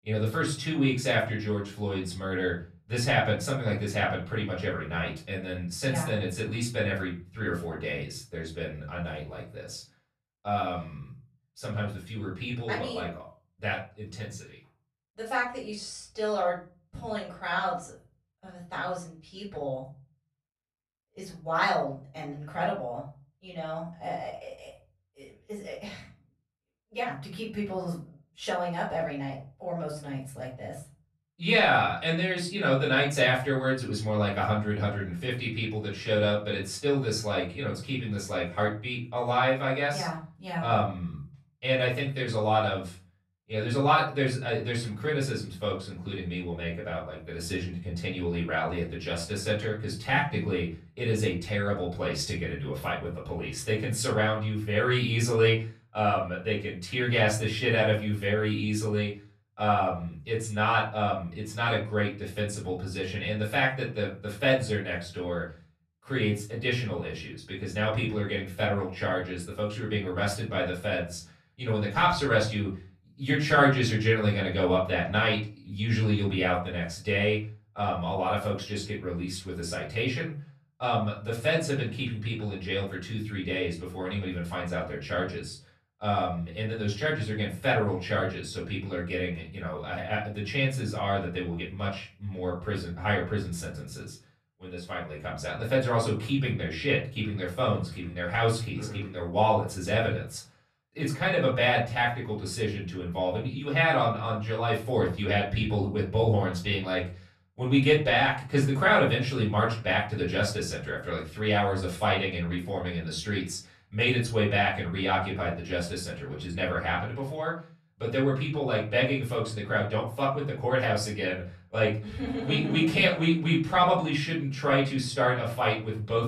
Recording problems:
off-mic speech; far
room echo; slight; dies away in 0.4 s

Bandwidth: 13.5 kHz